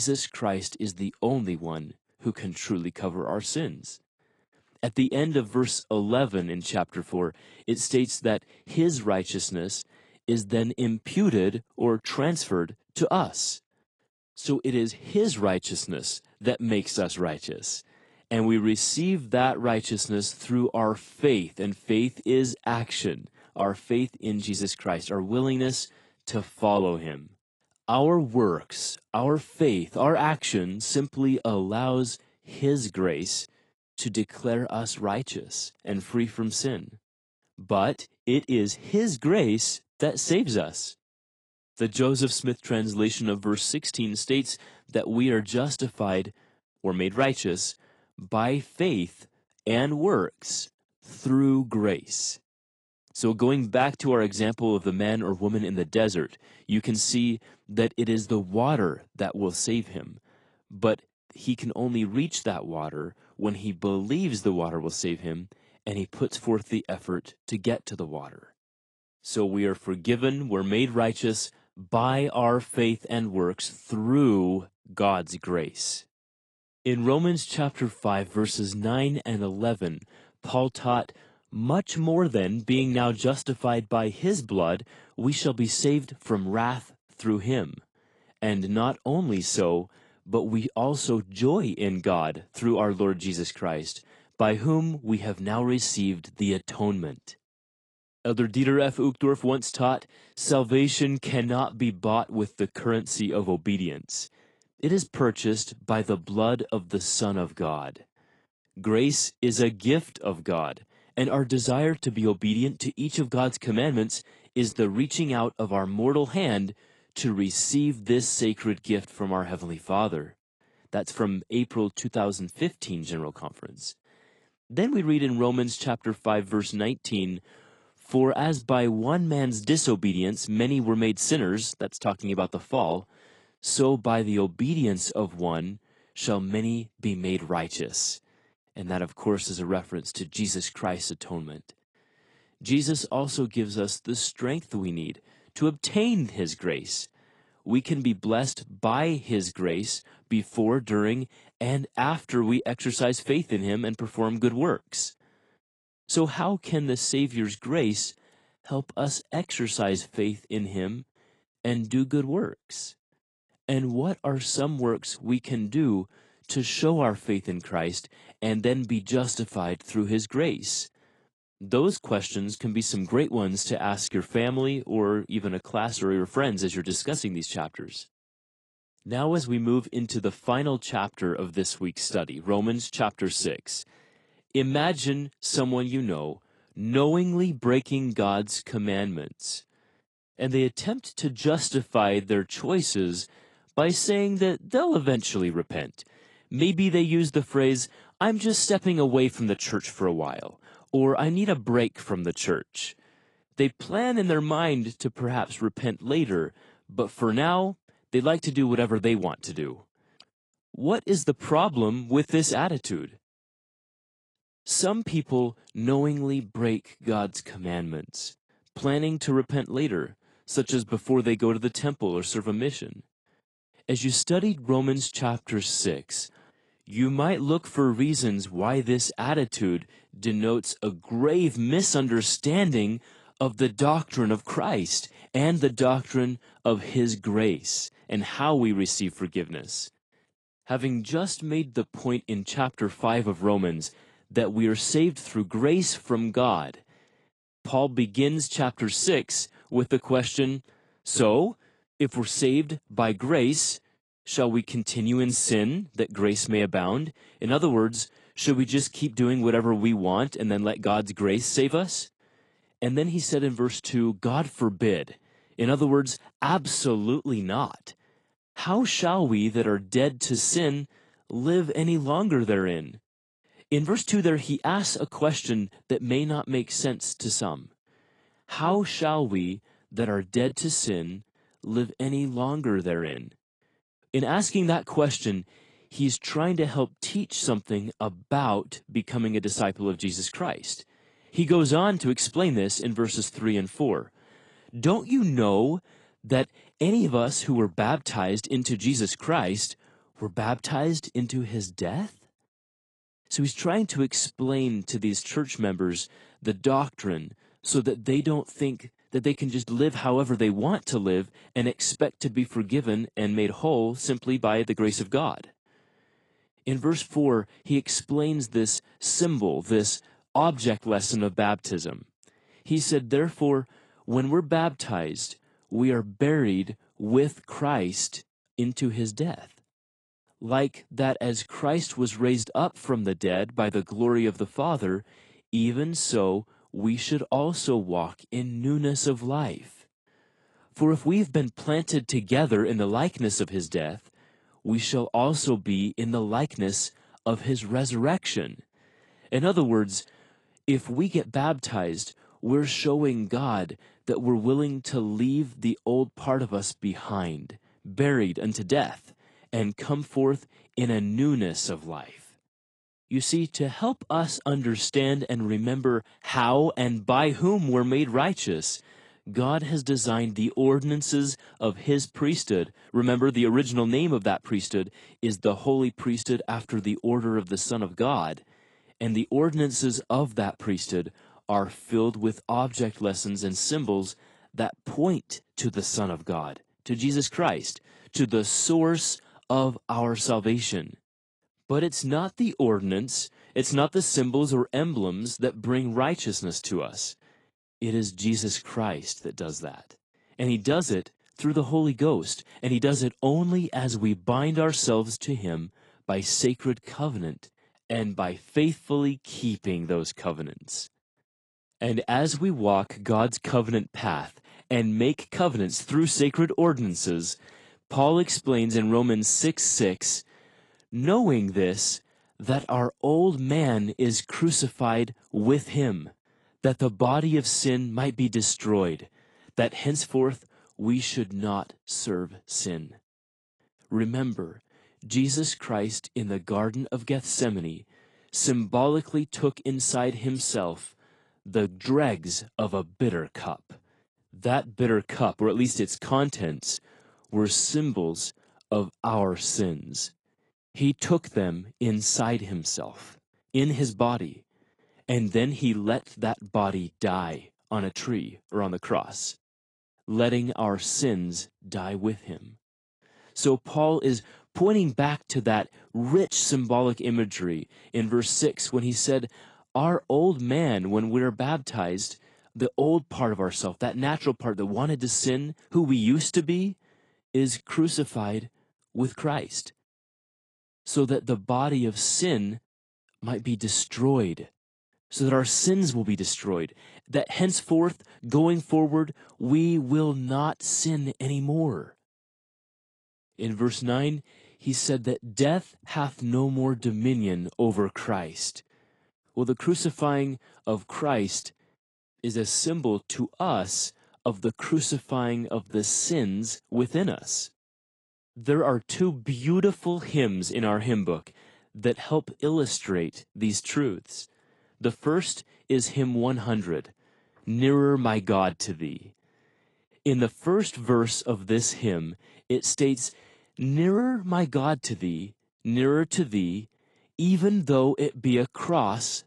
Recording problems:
garbled, watery; slightly
abrupt cut into speech; at the start

